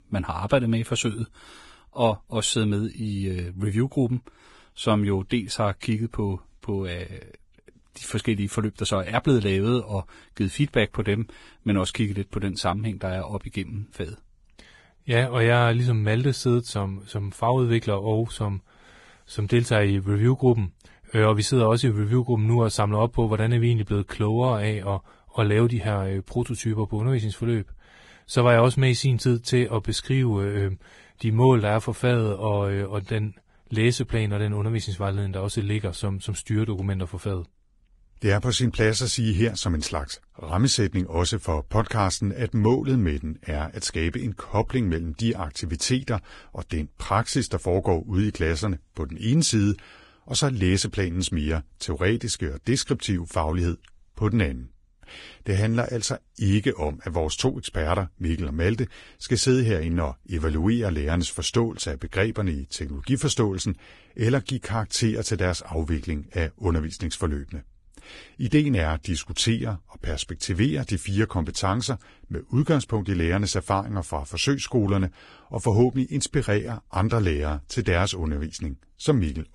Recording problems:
garbled, watery; badly; nothing above 10 kHz

